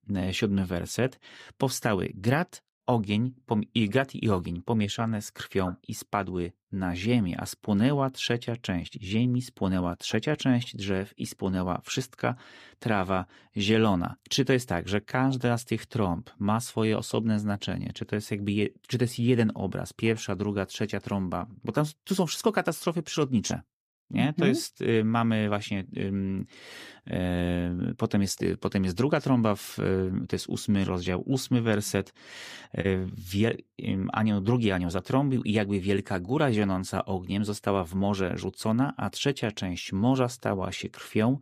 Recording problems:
none

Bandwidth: 15 kHz